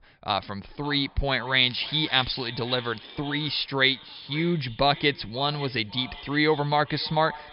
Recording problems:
echo of what is said; noticeable; throughout; 550 ms later, 15 dB below the speech
high frequencies cut off; noticeable; nothing above 5.5 kHz
crackling; noticeable; at 1.5 s; 20 dB below the speech

